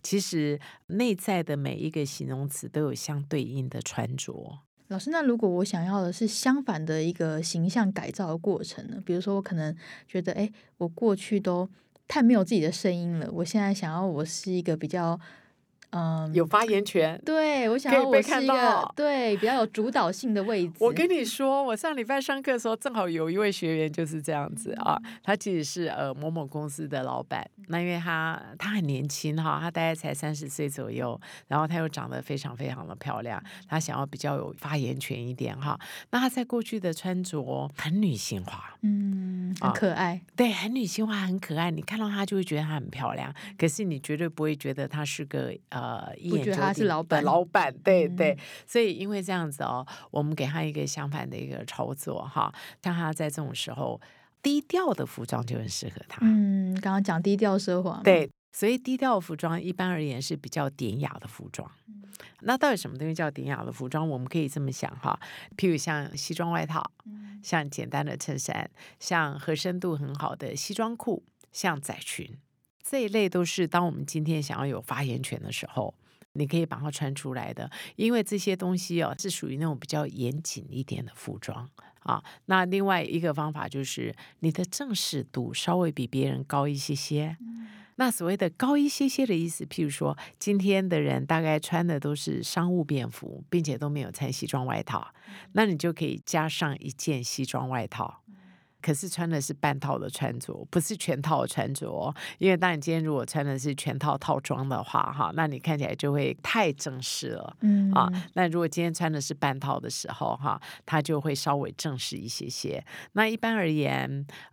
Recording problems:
none

